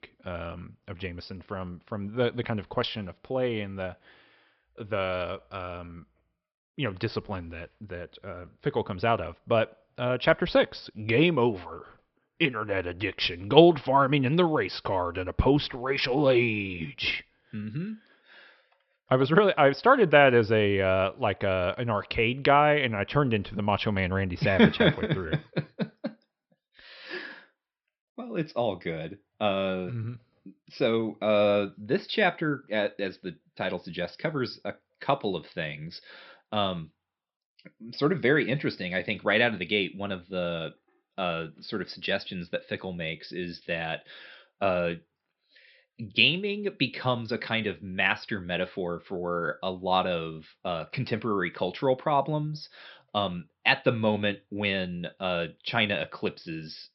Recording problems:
high frequencies cut off; noticeable; nothing above 5.5 kHz

